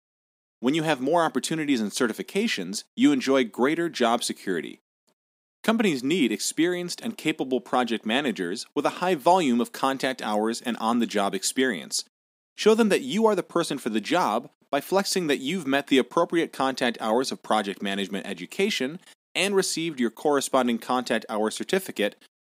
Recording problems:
none

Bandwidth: 15.5 kHz